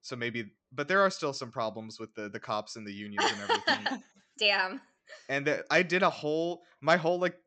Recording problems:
high frequencies cut off; noticeable; nothing above 8 kHz

